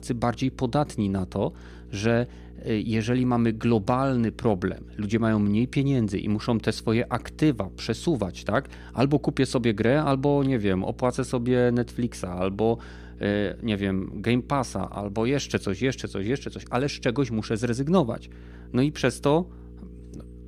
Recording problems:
electrical hum; faint; throughout; 60 Hz, 25 dB below the speech

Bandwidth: 15 kHz